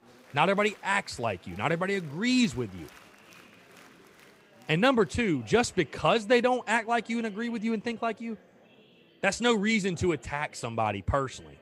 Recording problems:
murmuring crowd; faint; throughout; 25 dB below the speech

